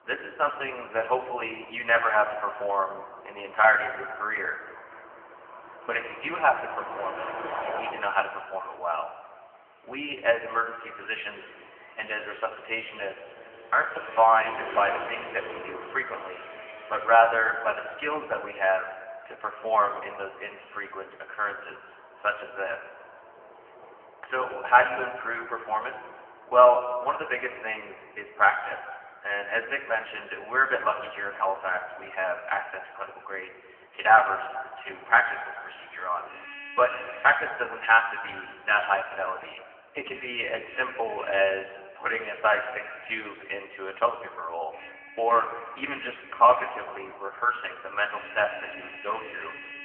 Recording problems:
phone-call audio; poor line; nothing above 3 kHz
off-mic speech; far
room echo; noticeable; dies away in 2 s
traffic noise; noticeable; throughout; 15 dB below the speech

